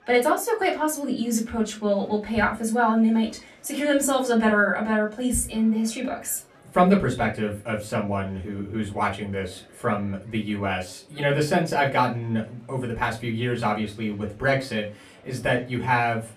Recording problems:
off-mic speech; far
room echo; very slight; dies away in 0.2 s
murmuring crowd; faint; throughout; 30 dB below the speech

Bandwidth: 13.5 kHz